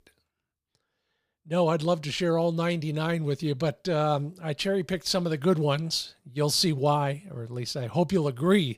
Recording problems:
none

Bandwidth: 15 kHz